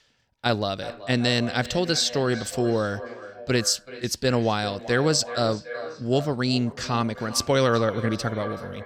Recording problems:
echo of what is said; noticeable; throughout; 380 ms later, 15 dB below the speech

